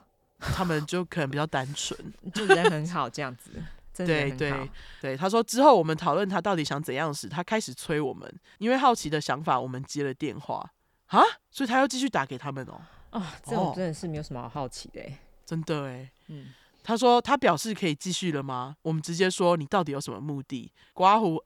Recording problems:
none

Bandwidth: 18.5 kHz